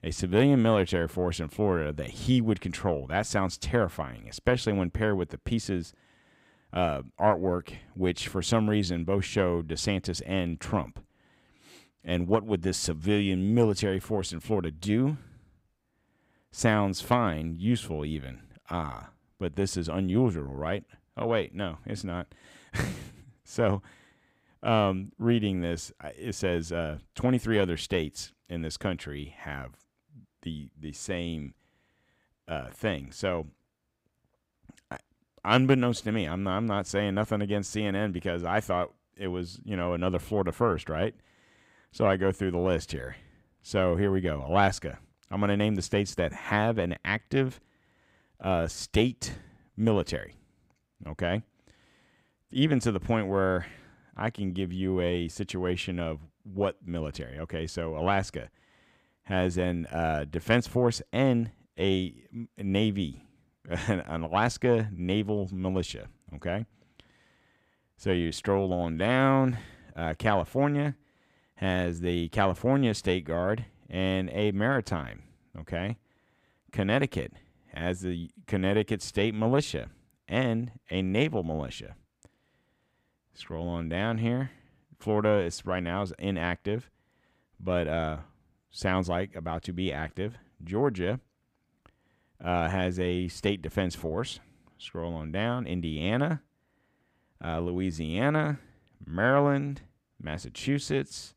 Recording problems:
none

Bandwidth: 15.5 kHz